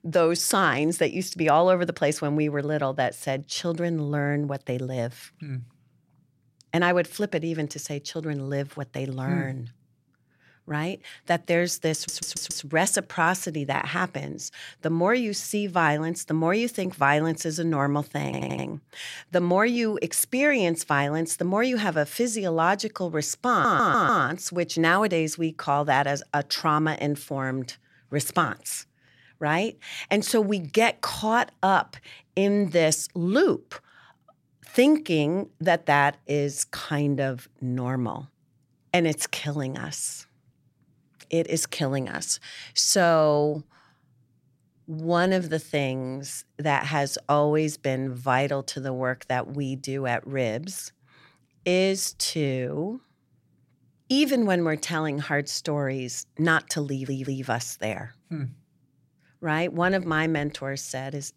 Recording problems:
audio stuttering; 4 times, first at 12 s

